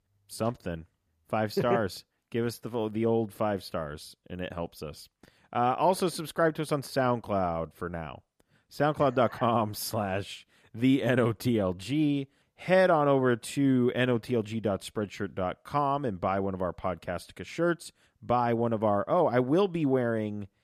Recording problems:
none

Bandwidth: 14.5 kHz